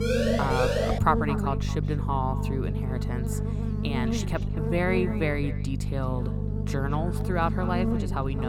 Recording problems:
echo of what is said; noticeable; throughout; 220 ms later, 15 dB below the speech
electrical hum; loud; throughout; 50 Hz, 7 dB below the speech
siren; loud; at the start; peak 4 dB above the speech
abrupt cut into speech; at the end

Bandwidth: 17 kHz